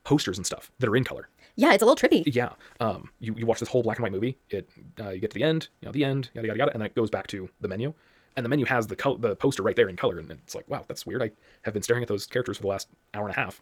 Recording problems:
wrong speed, natural pitch; too fast; 1.7 times normal speed

